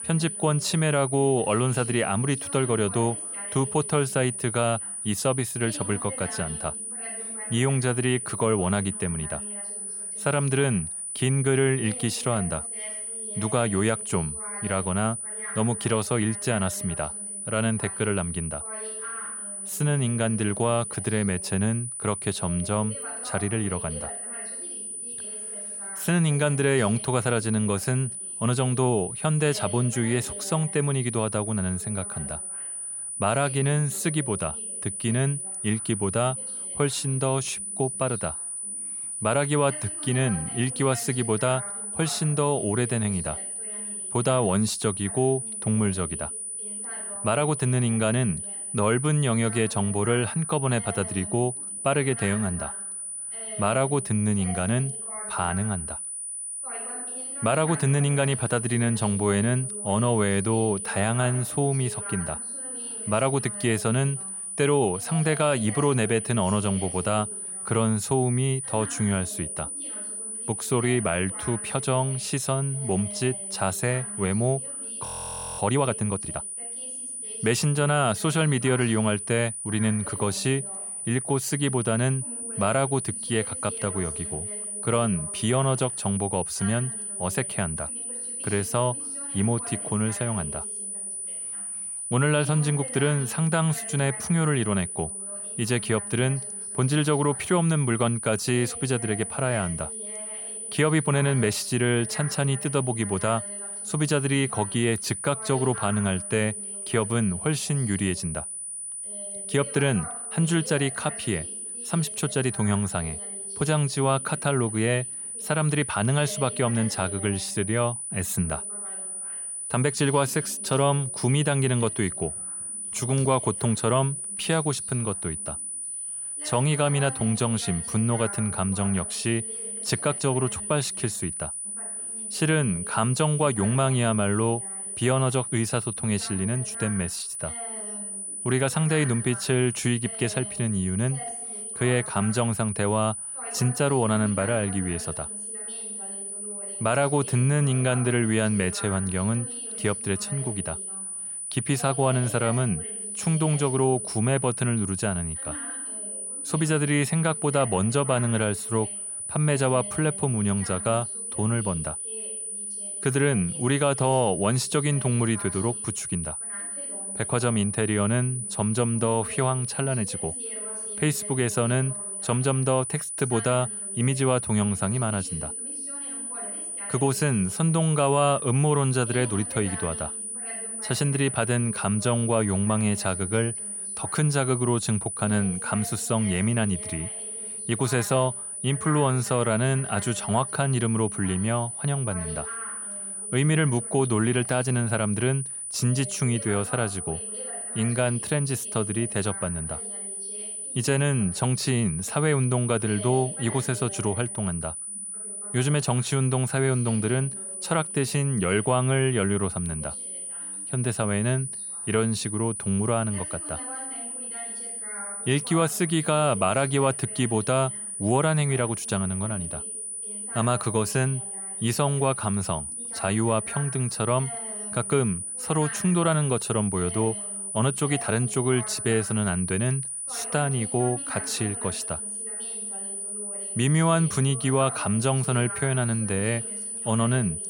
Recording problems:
high-pitched whine; loud; throughout; 9.5 kHz, 5 dB below the speech
voice in the background; noticeable; throughout; 20 dB below the speech
audio freezing; at 1:15 for 0.5 s

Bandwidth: 18 kHz